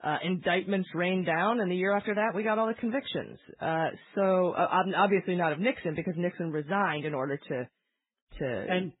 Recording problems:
garbled, watery; badly
high frequencies cut off; severe; nothing above 4 kHz

